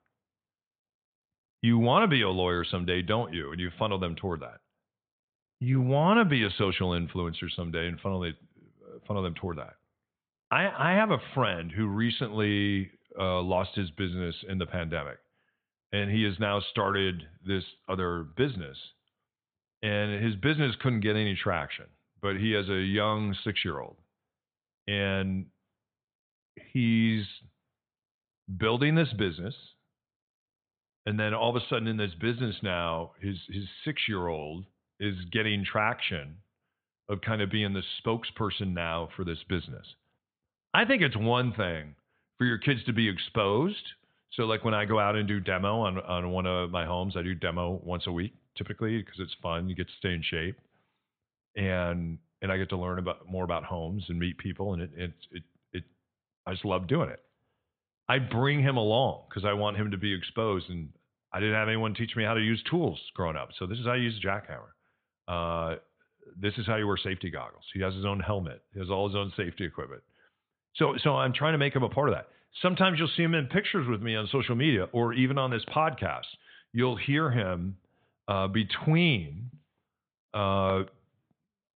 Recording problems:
high frequencies cut off; severe; nothing above 4 kHz

